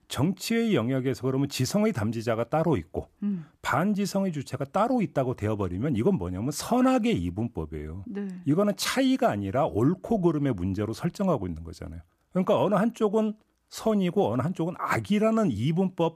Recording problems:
none

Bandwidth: 14.5 kHz